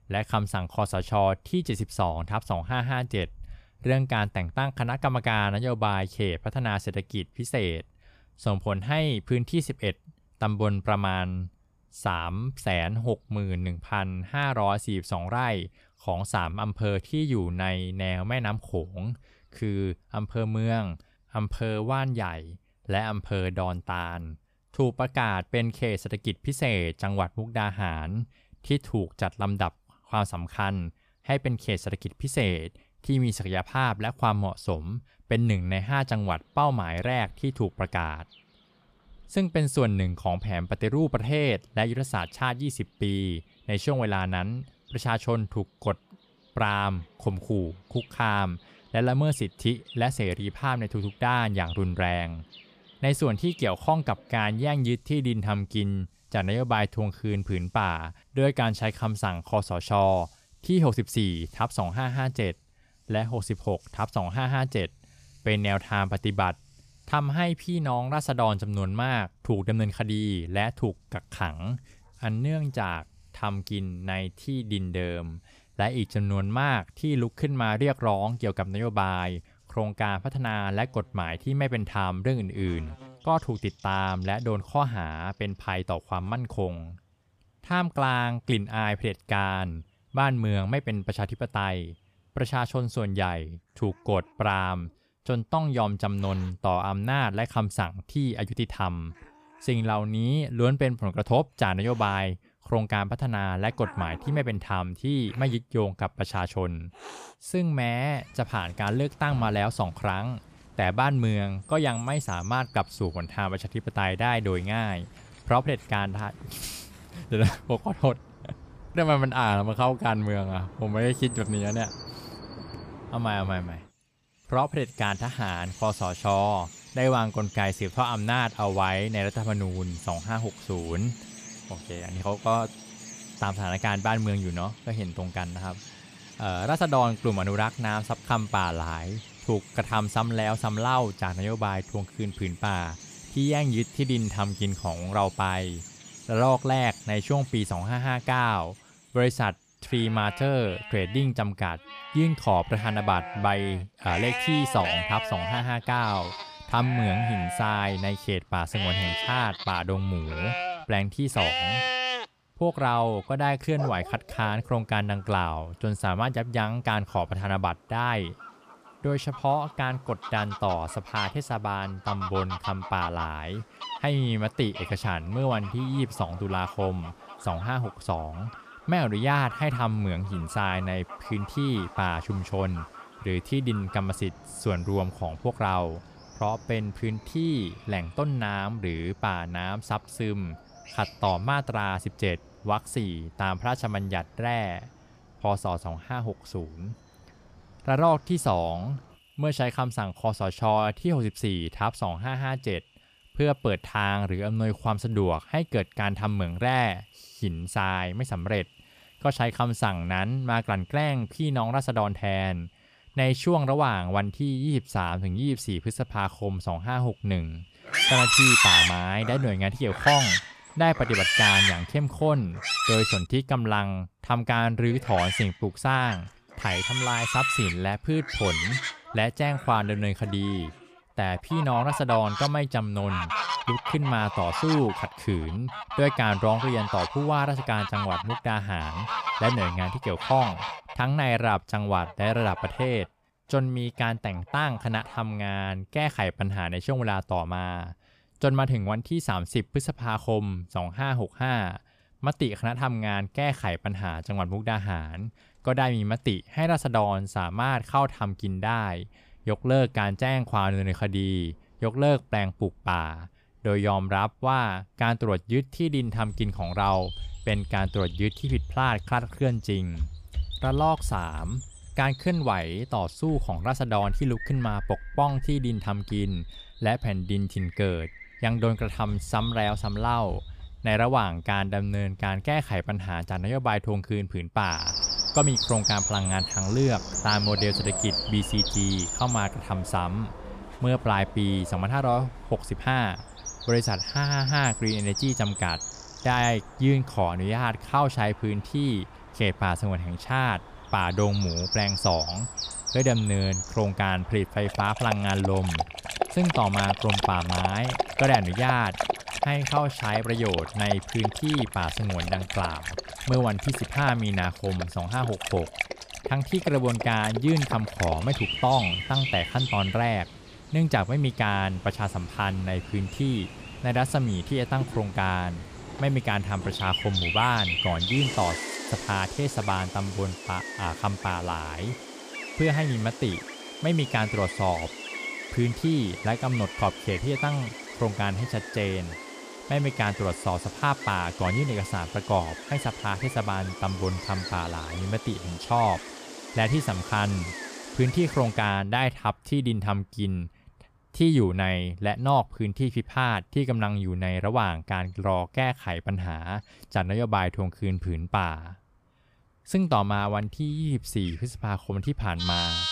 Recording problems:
animal sounds; loud; throughout; 4 dB below the speech

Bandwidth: 14.5 kHz